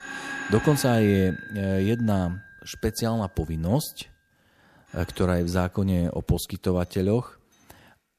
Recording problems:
alarms or sirens; noticeable; throughout; 10 dB below the speech

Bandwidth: 14.5 kHz